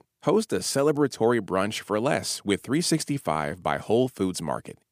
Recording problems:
none

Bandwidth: 15 kHz